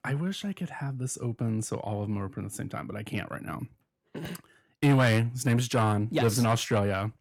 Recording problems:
distortion; heavy; 8 dB below the speech

